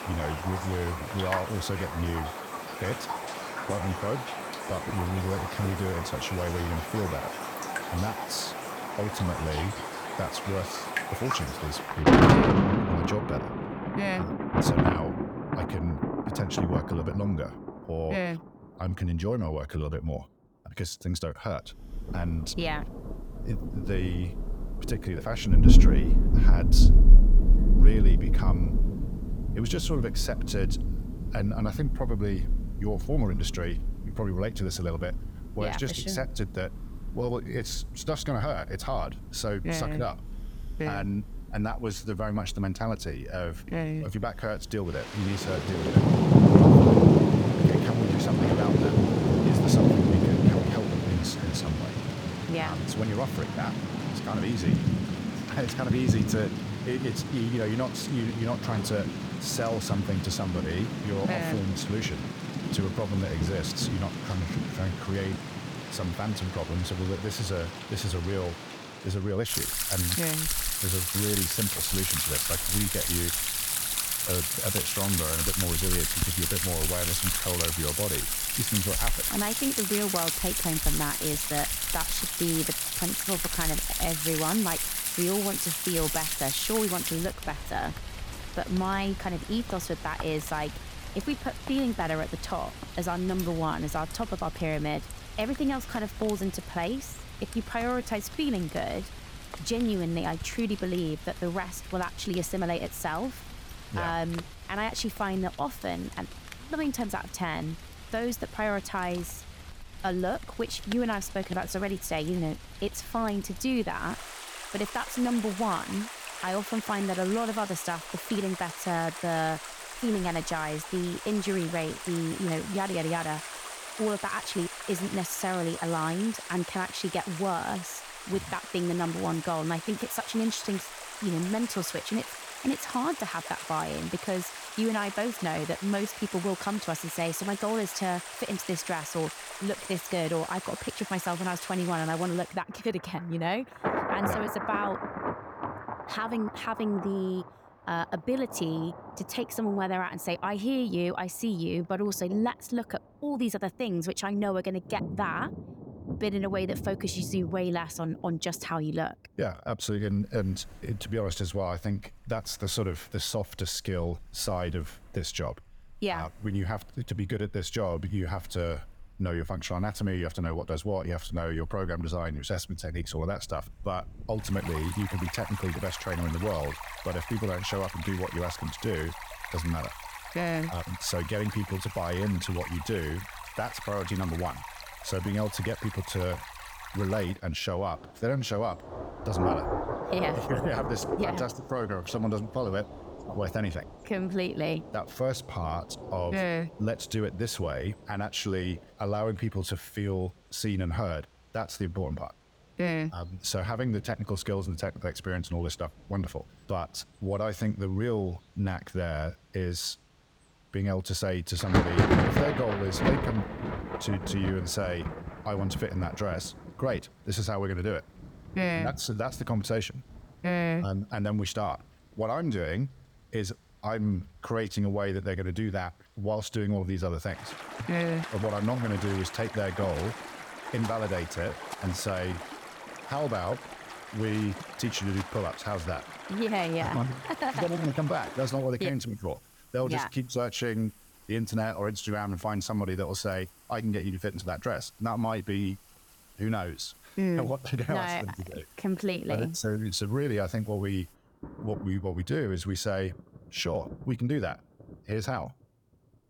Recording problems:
rain or running water; very loud; throughout; 2 dB above the speech

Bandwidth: 18.5 kHz